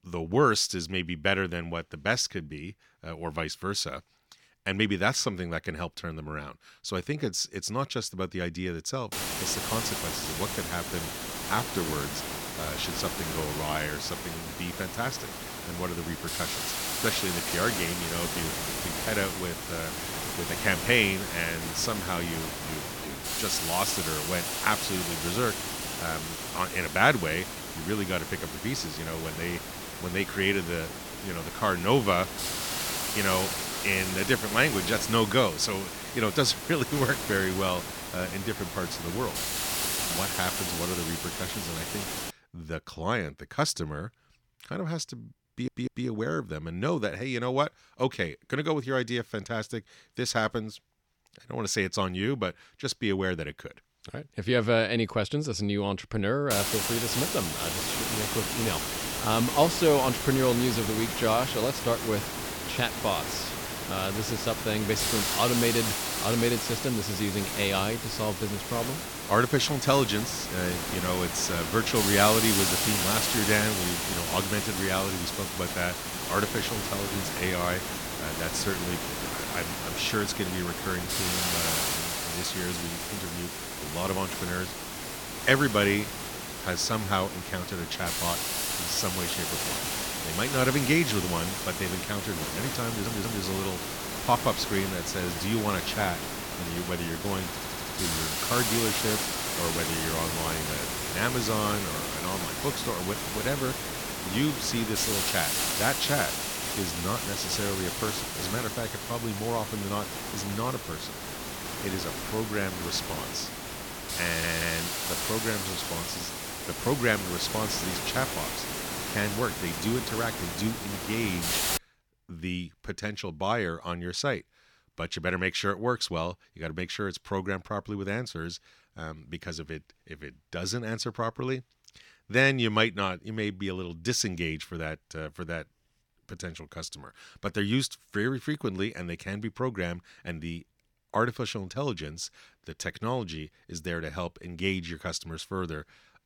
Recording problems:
hiss; loud; from 9 to 42 s and from 57 s to 2:02; 1 dB below the speech
audio stuttering; 4 times, first at 45 s

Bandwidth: 18 kHz